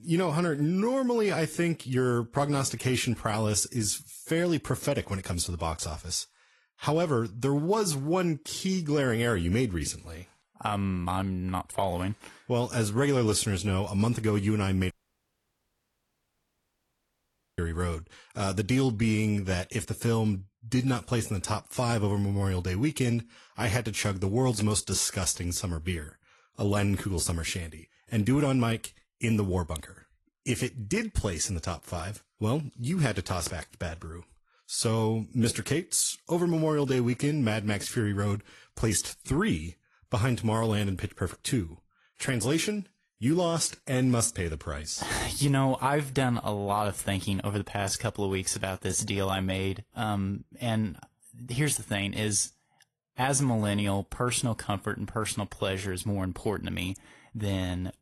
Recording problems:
garbled, watery; slightly; nothing above 11.5 kHz
audio cutting out; at 15 s for 2.5 s

